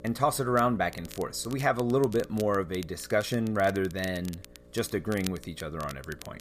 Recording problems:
crackle, like an old record; noticeable; 20 dB below the speech
electrical hum; faint; throughout; 60 Hz, 25 dB below the speech

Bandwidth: 14.5 kHz